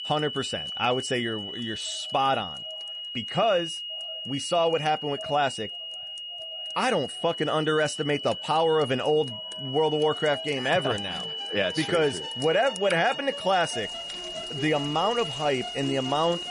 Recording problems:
echo of what is said; faint; throughout; 580 ms later, 25 dB below the speech
garbled, watery; slightly; nothing above 10.5 kHz
high-pitched whine; loud; throughout; 3 kHz, 7 dB below the speech
background music; noticeable; throughout; 20 dB below the speech
rain or running water; noticeable; throughout; 20 dB below the speech

